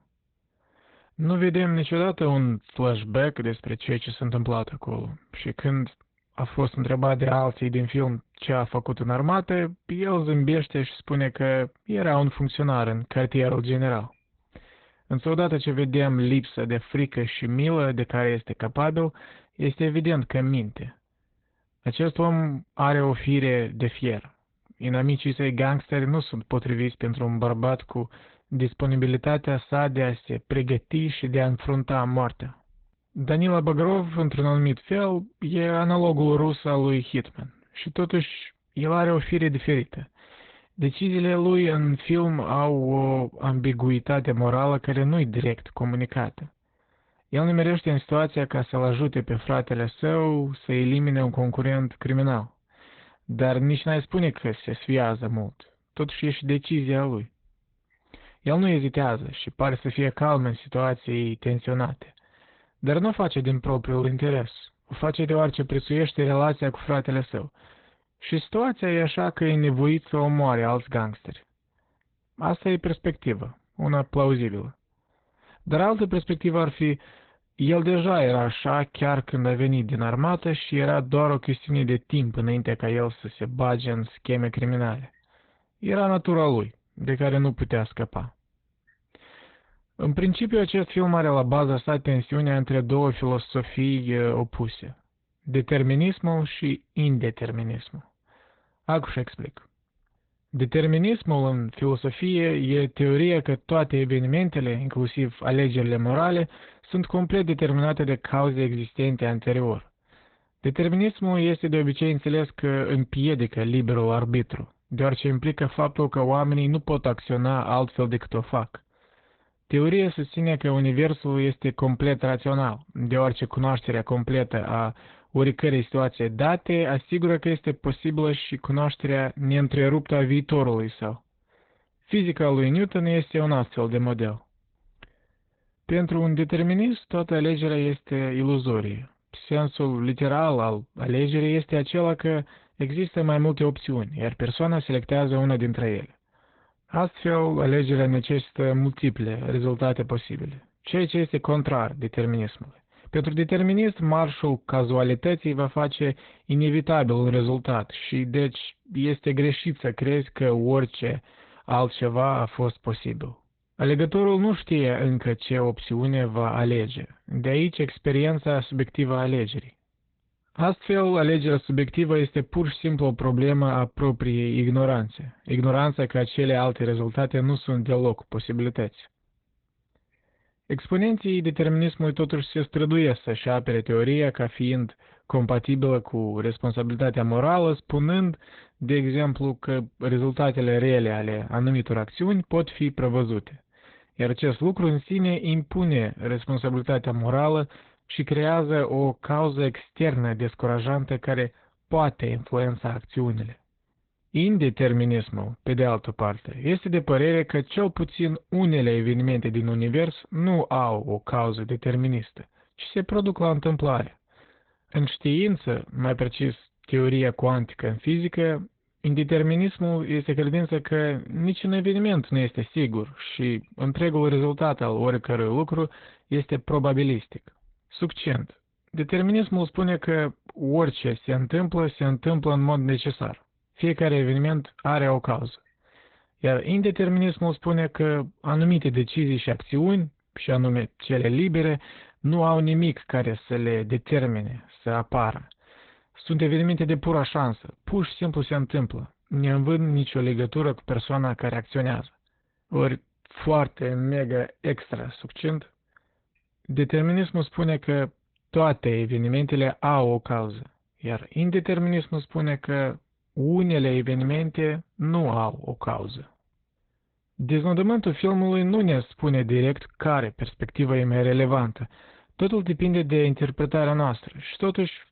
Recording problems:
garbled, watery; badly; nothing above 4 kHz

